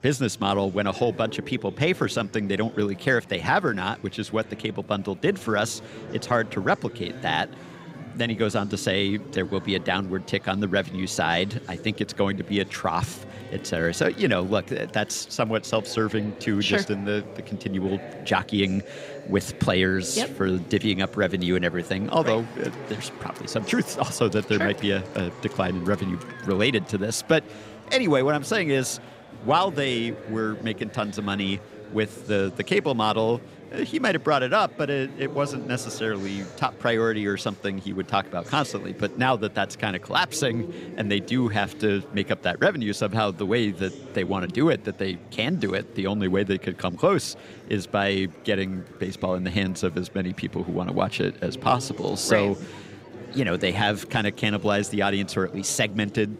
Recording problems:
murmuring crowd; noticeable; throughout; 15 dB below the speech

